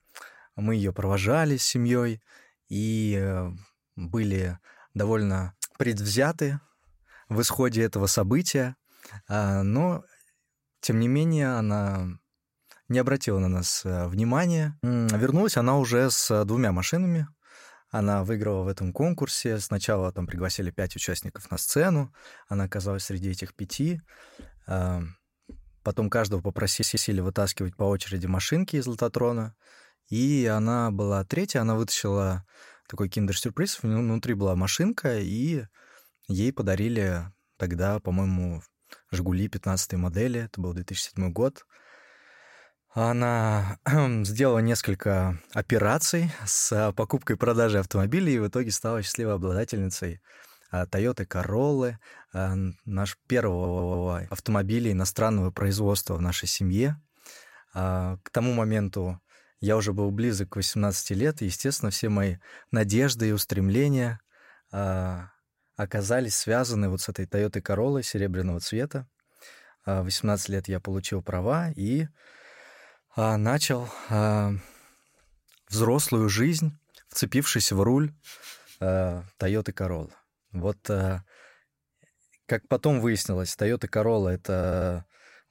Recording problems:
audio stuttering; at 27 s, at 54 s and at 1:25

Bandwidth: 16 kHz